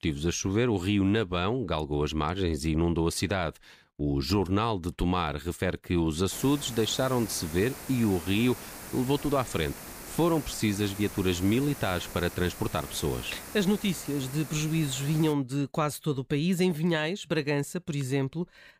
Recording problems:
hiss; noticeable; from 6.5 to 15 s; 15 dB below the speech

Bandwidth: 15 kHz